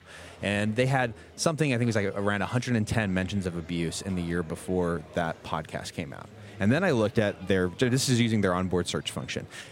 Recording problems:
murmuring crowd; faint; throughout; 20 dB below the speech

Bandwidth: 16 kHz